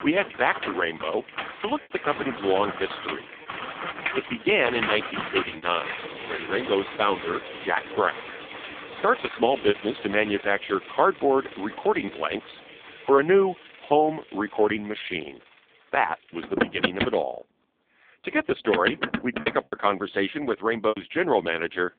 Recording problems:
phone-call audio; poor line
traffic noise; loud; throughout; 8 dB below the speech
choppy; occasionally; 3% of the speech affected

